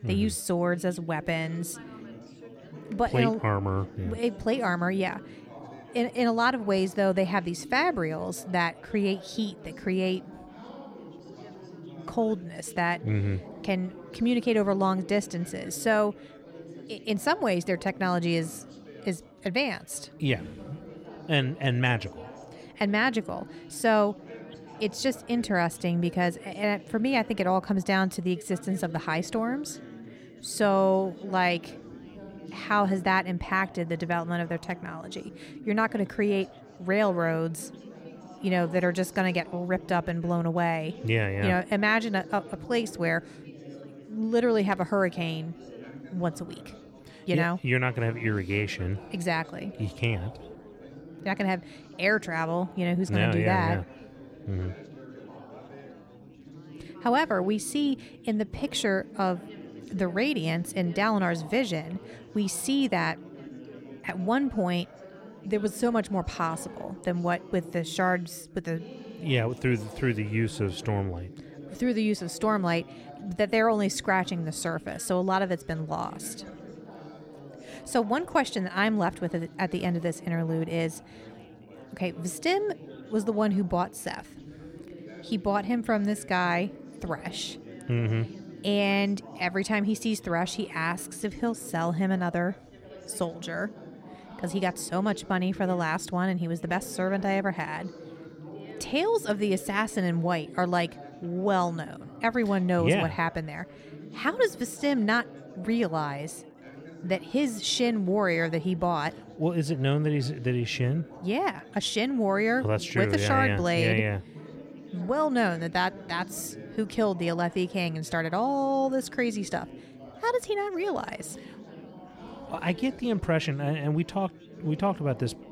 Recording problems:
chatter from many people; noticeable; throughout; 15 dB below the speech

